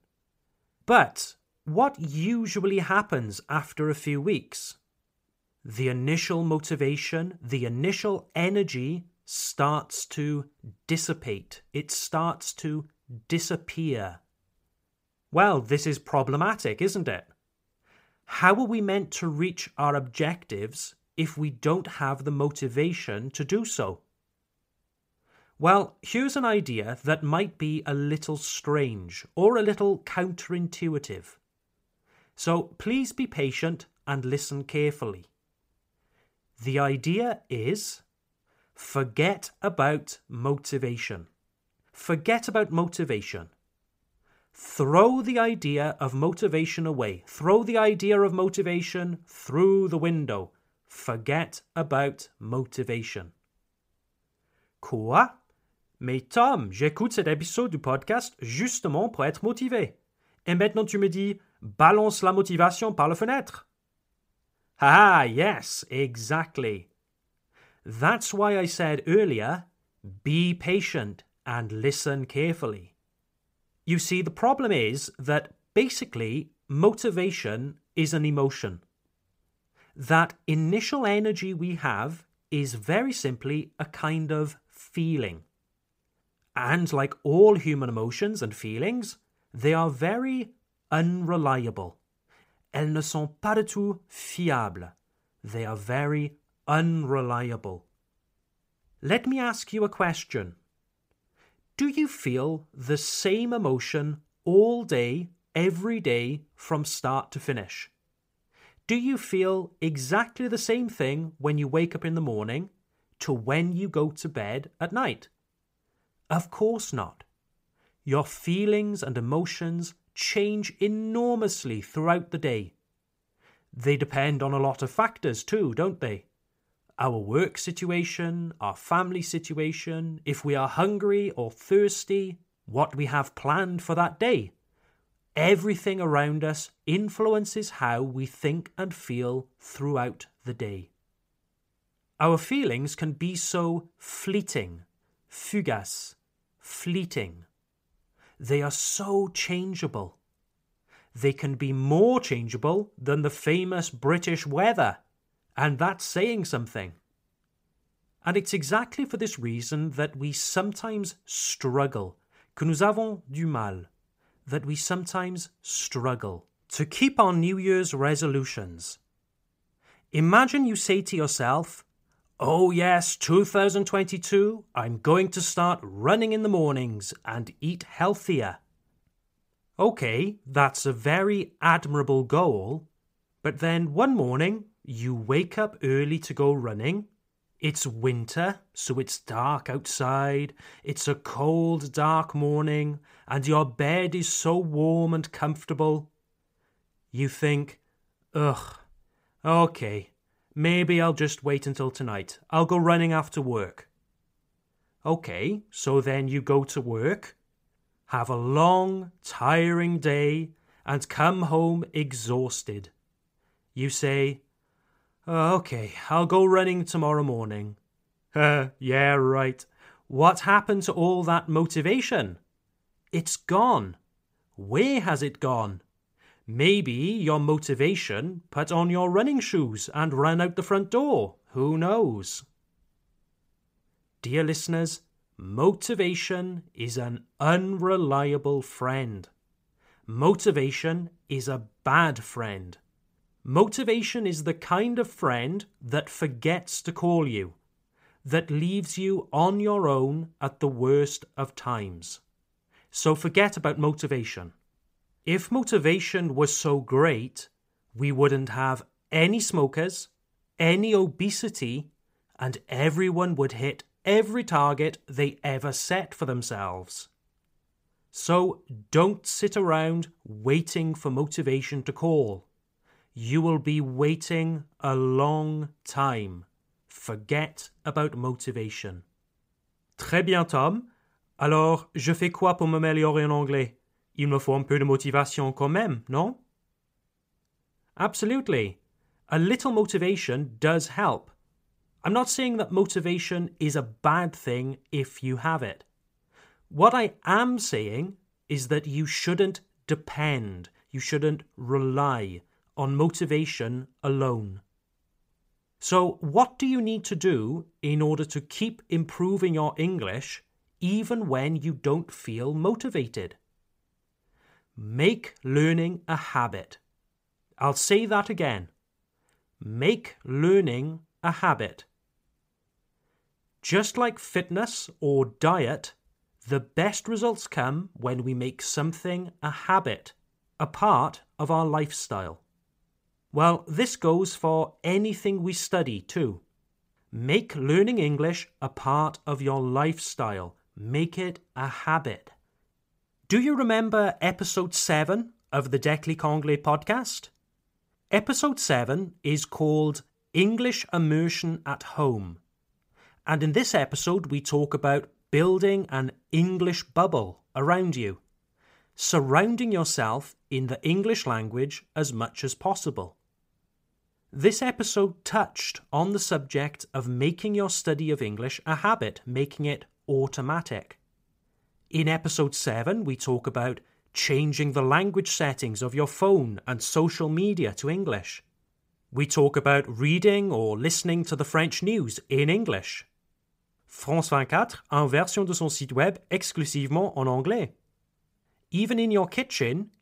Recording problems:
none

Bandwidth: 15.5 kHz